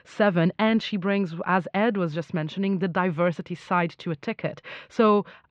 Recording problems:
muffled; very; fading above 3.5 kHz

